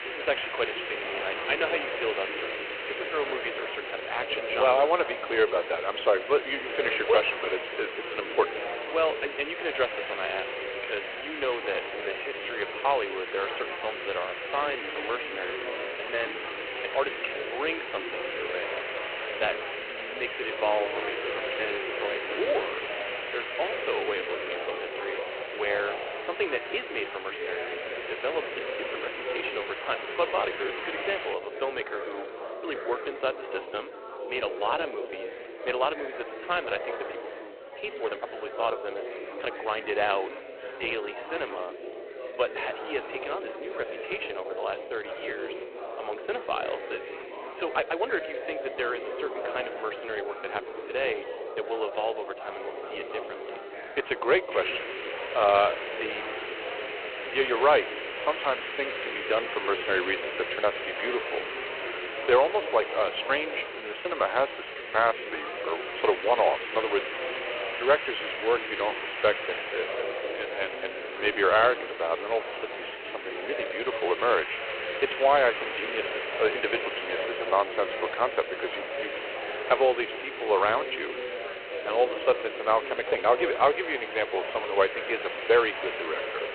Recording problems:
phone-call audio; poor line
chatter from many people; loud; throughout; 8 dB below the speech
hiss; loud; until 31 s and from 55 s on; 6 dB below the speech
uneven, jittery; strongly; from 12 s to 1:23

